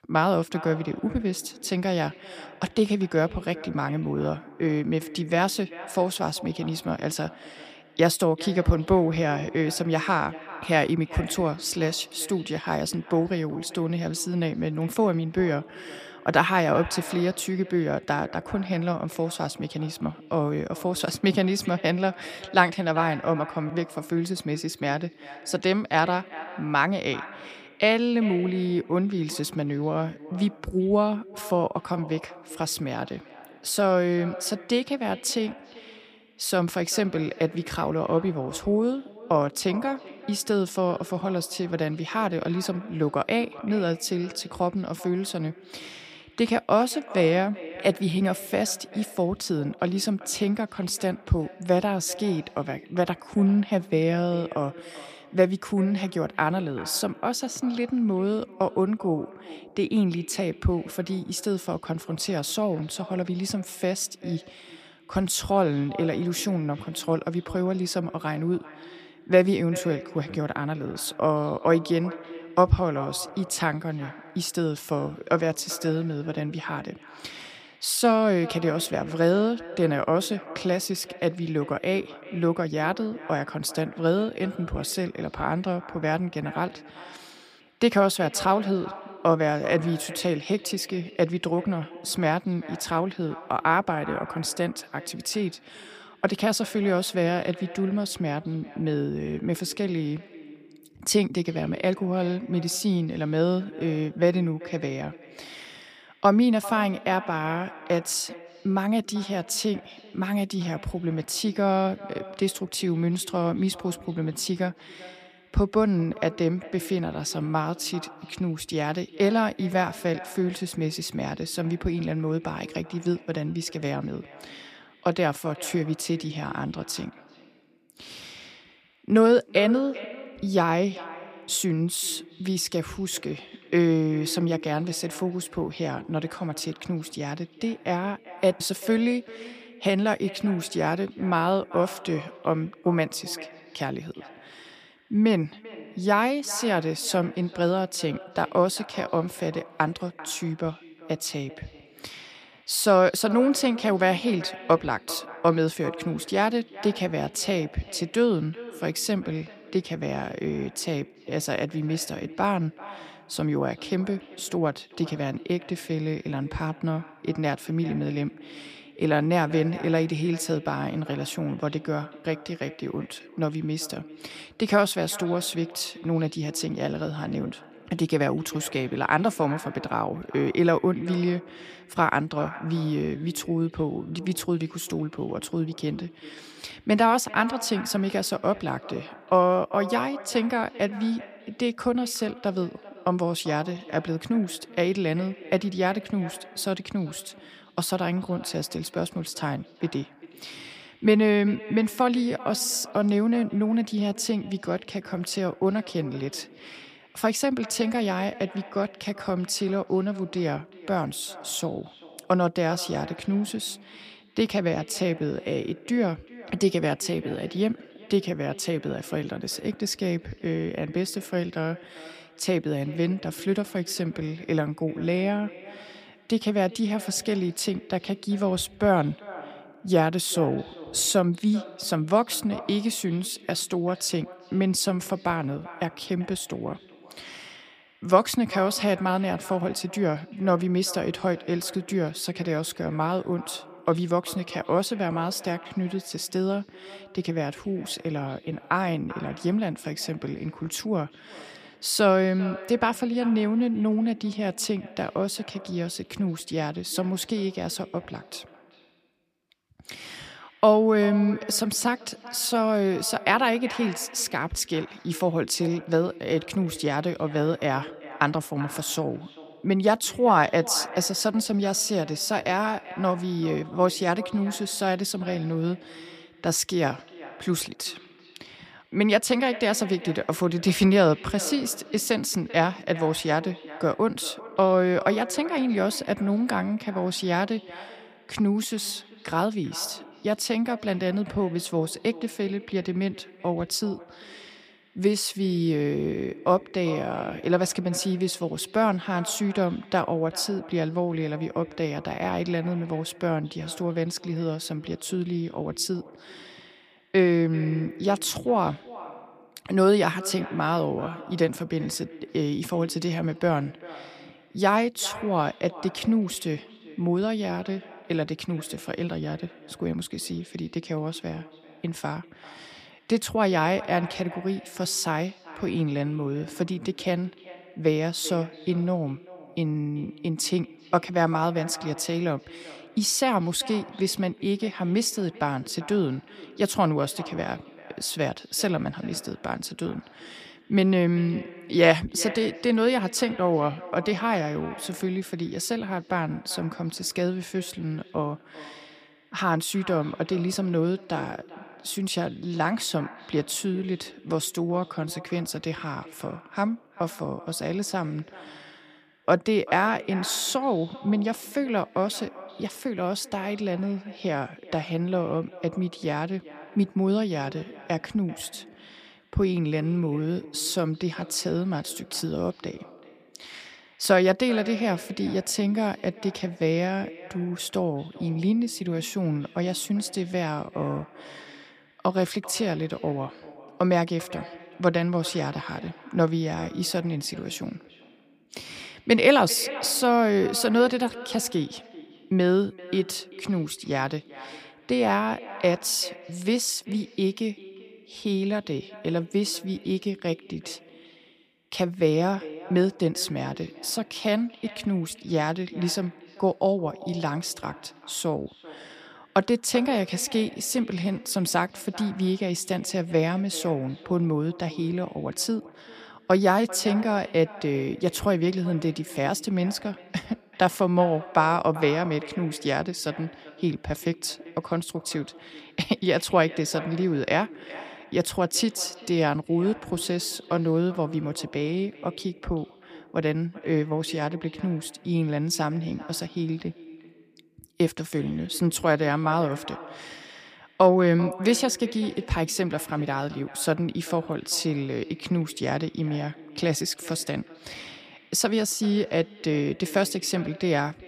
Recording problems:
echo of what is said; noticeable; throughout; 390 ms later, 20 dB below the speech

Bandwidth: 15 kHz